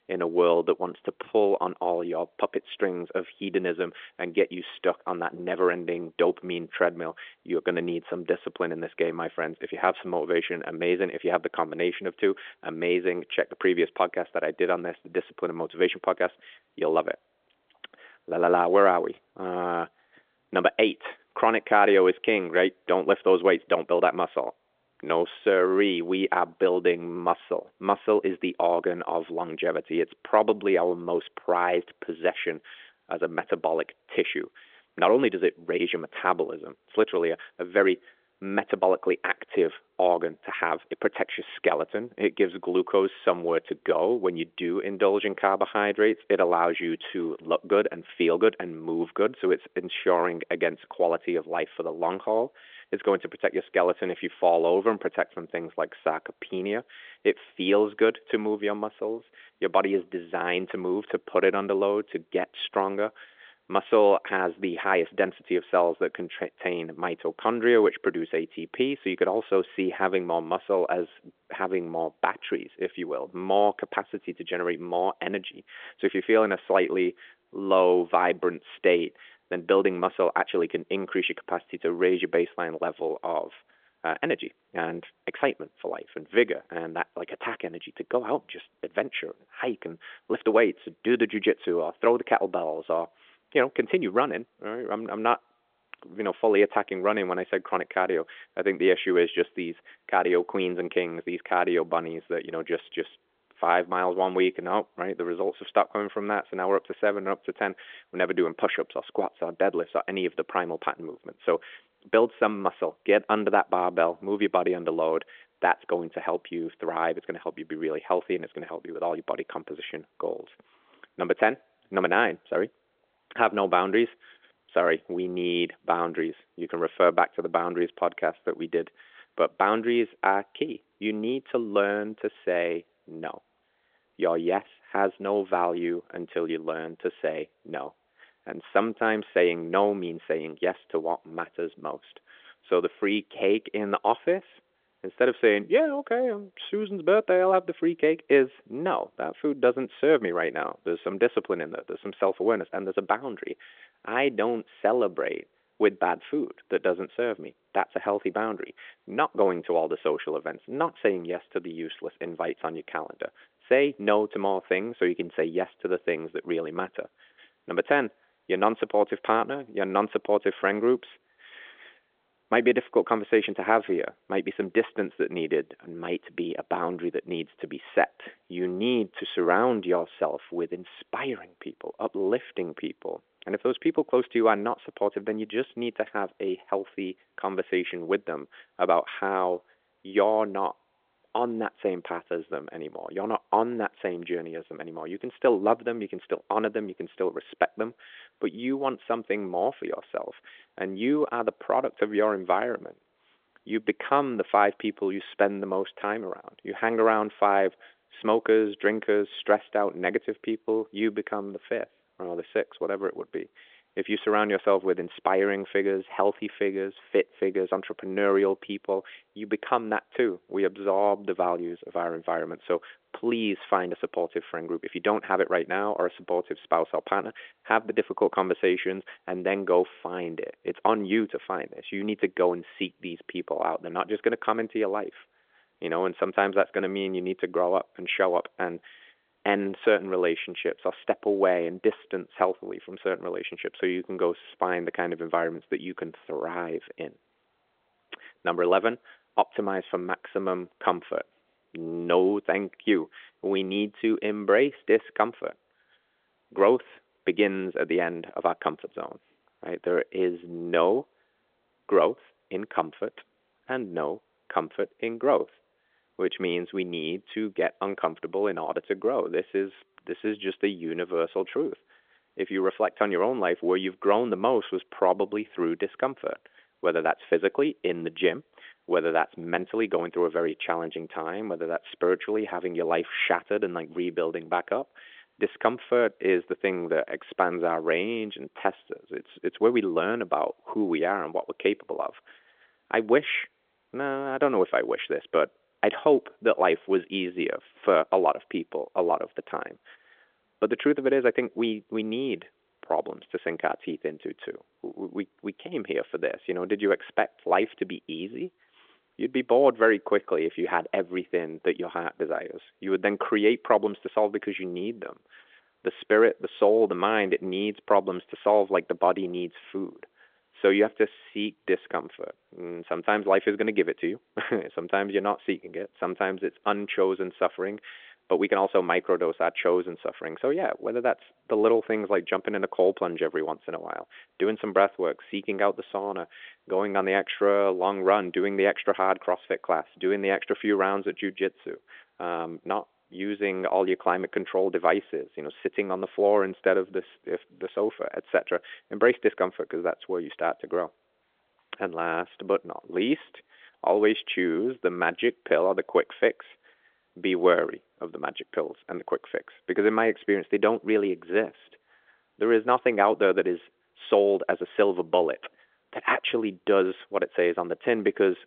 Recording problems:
phone-call audio; nothing above 3.5 kHz

